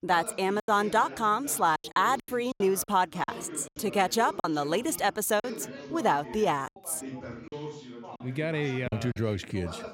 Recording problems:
background chatter; noticeable; throughout; 2 voices, 15 dB below the speech
choppy; very; 8% of the speech affected

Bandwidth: 16 kHz